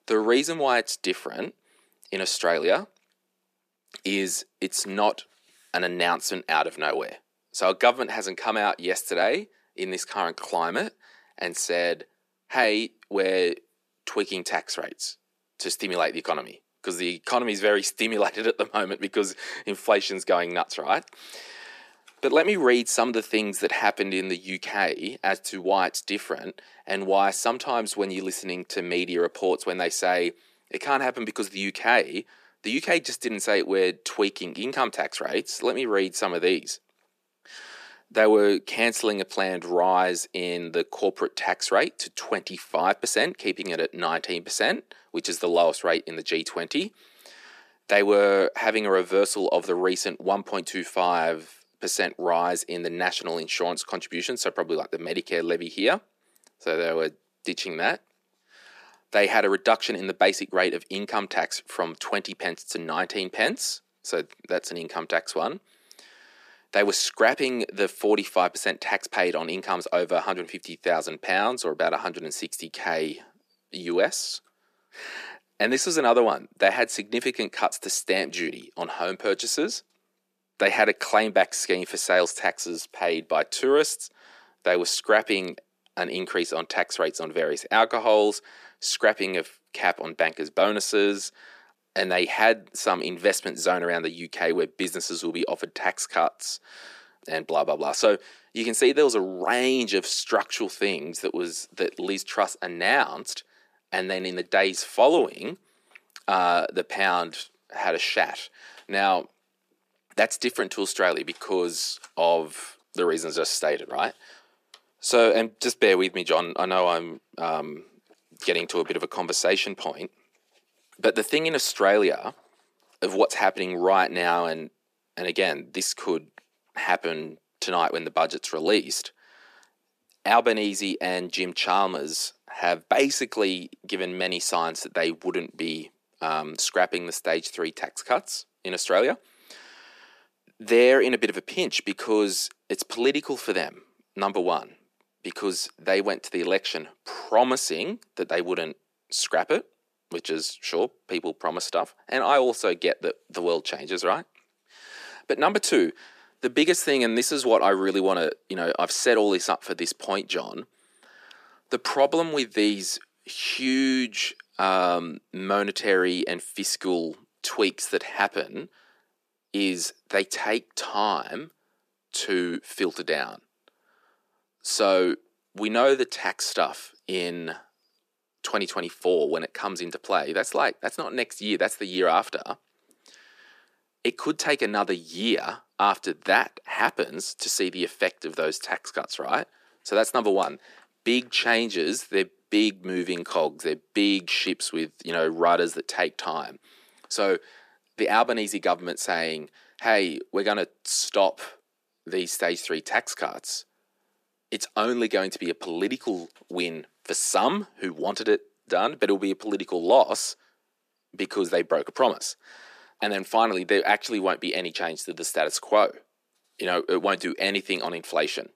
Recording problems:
thin; somewhat; fading below 300 Hz

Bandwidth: 14.5 kHz